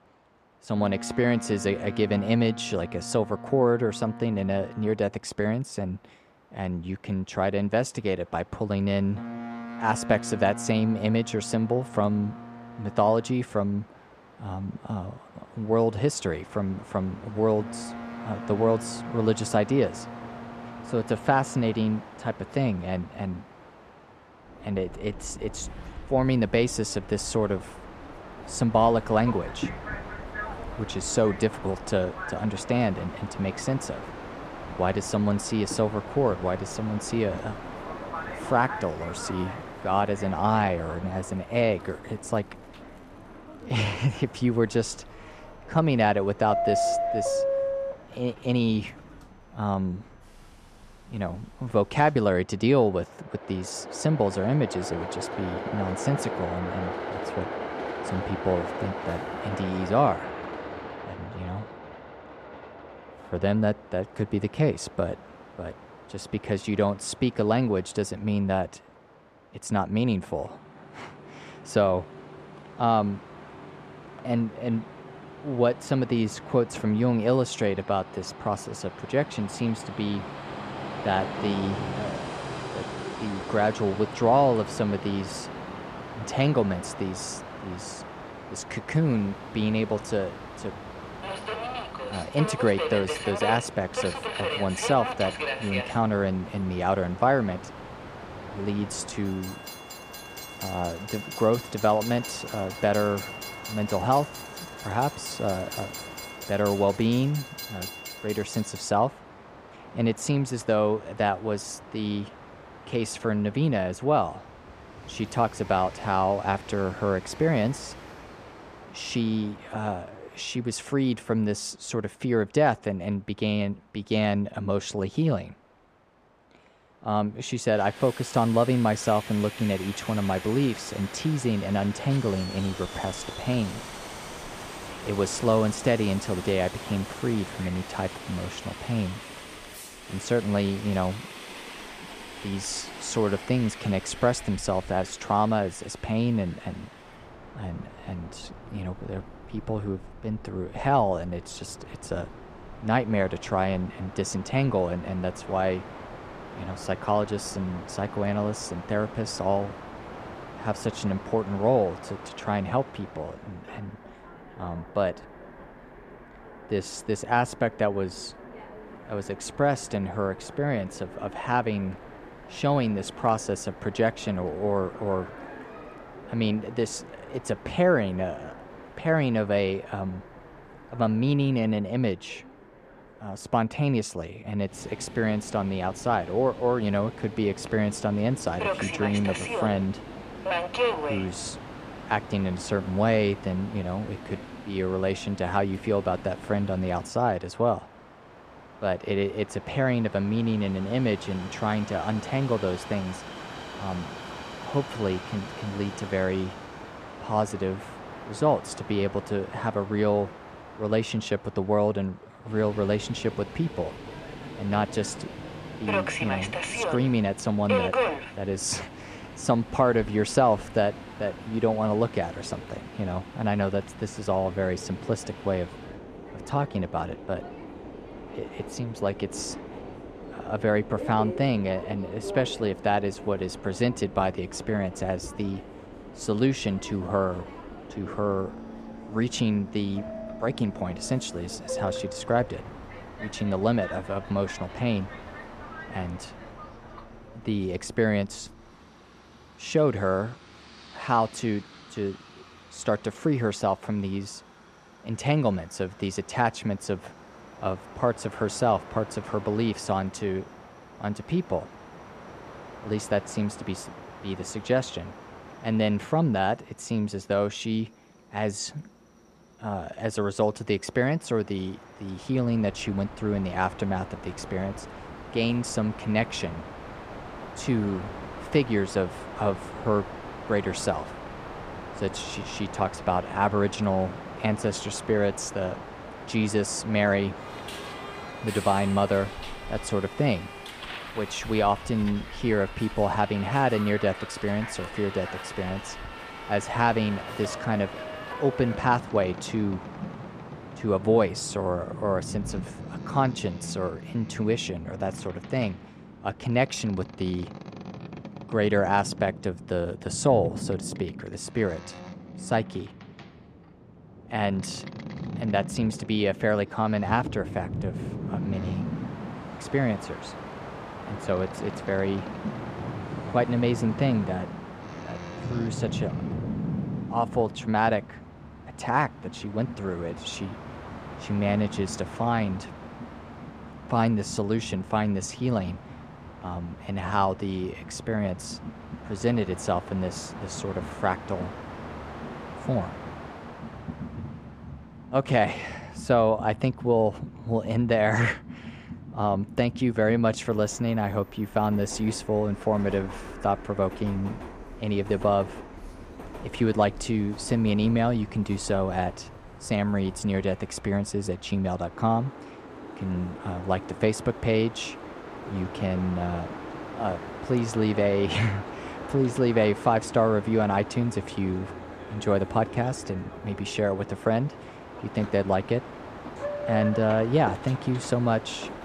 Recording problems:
train or aircraft noise; noticeable; throughout; 10 dB below the speech

